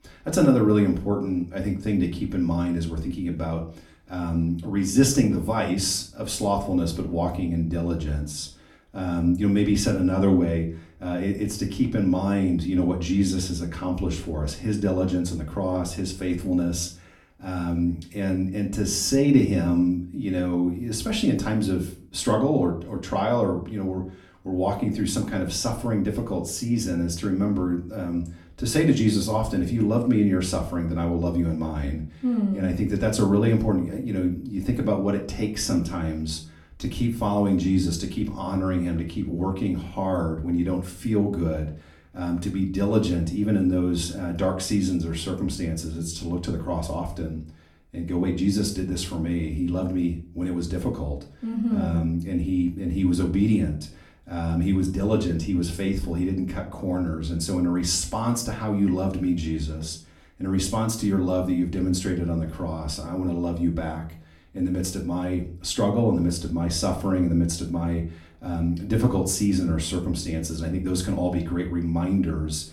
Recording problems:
off-mic speech; far
room echo; very slight; dies away in 0.4 s

